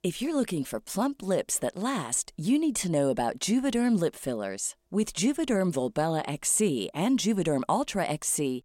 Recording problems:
none

